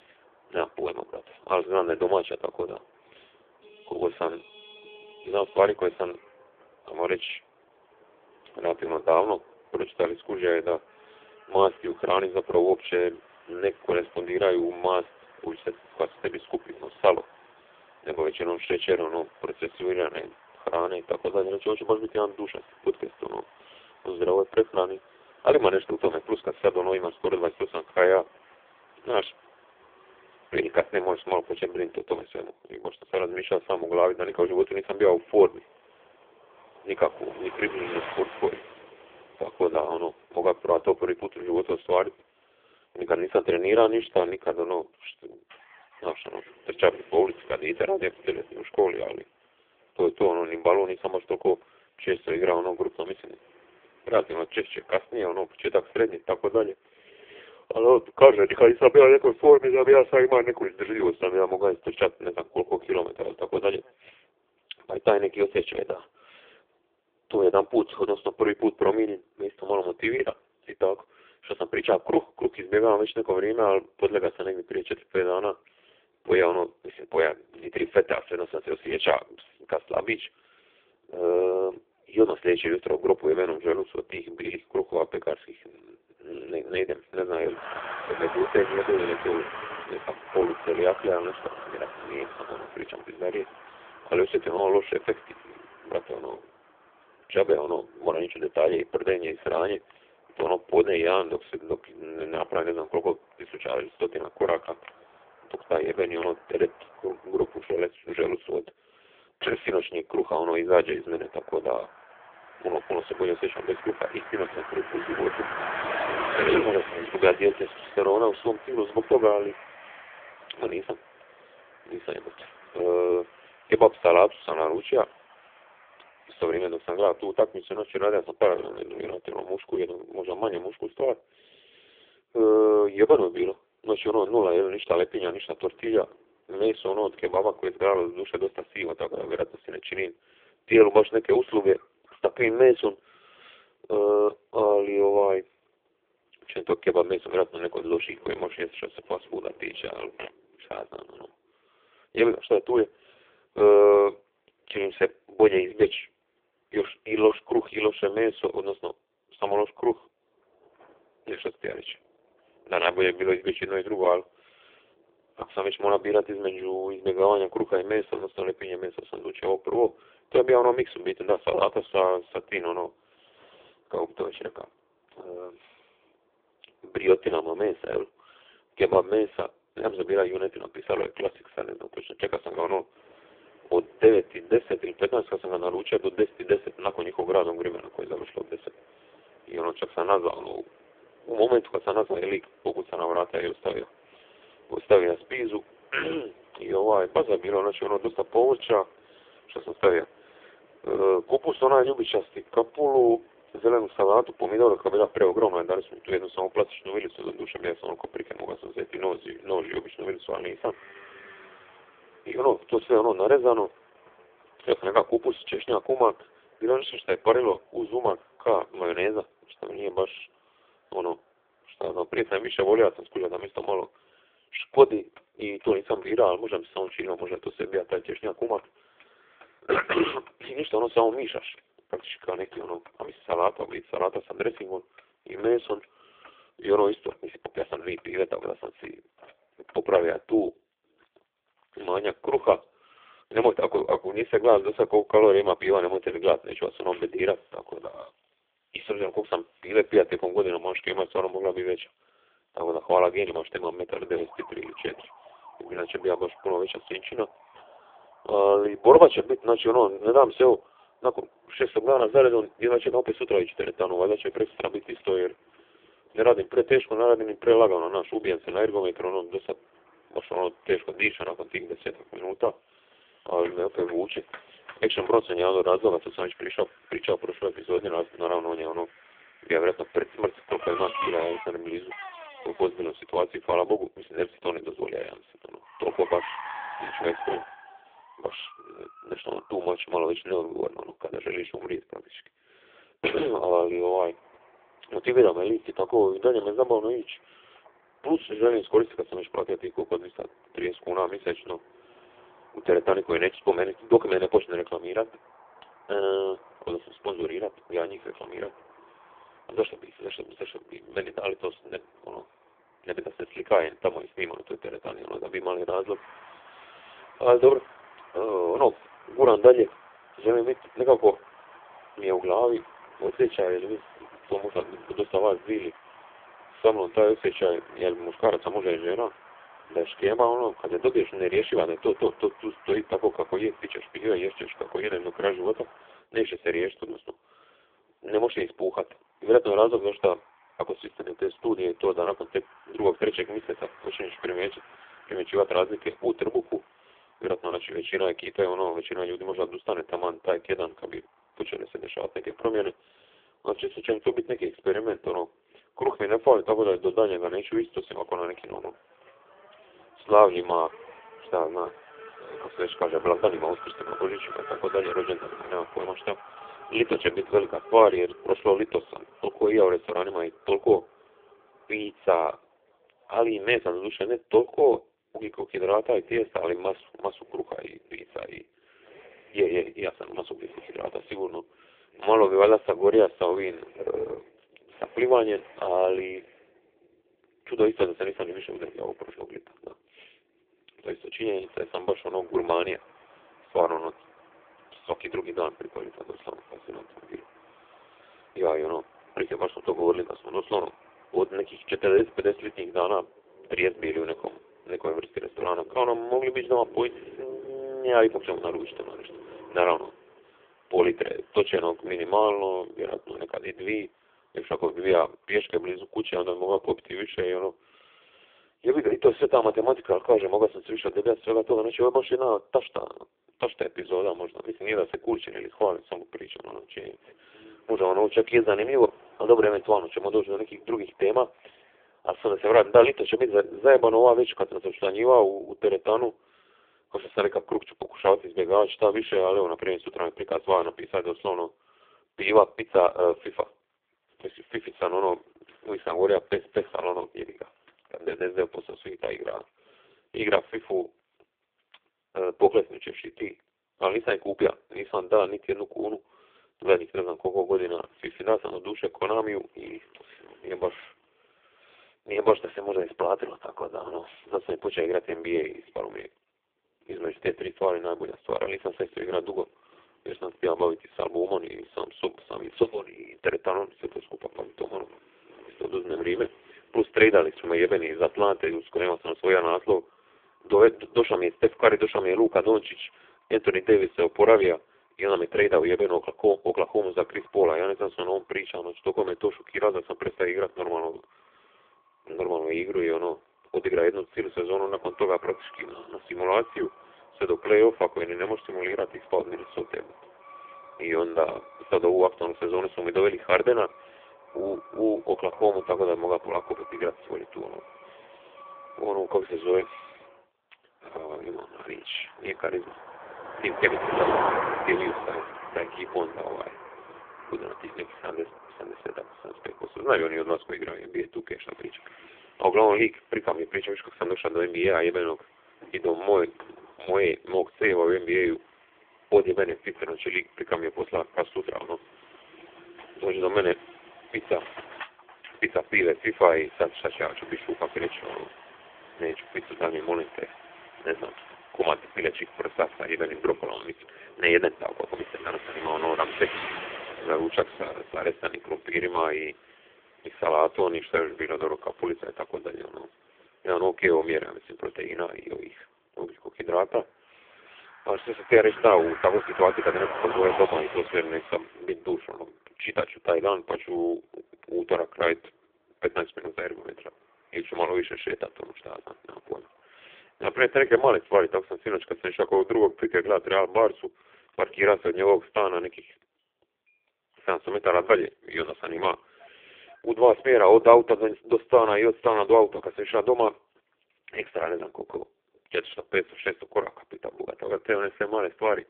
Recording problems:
phone-call audio; poor line
traffic noise; noticeable; throughout; 15 dB below the speech

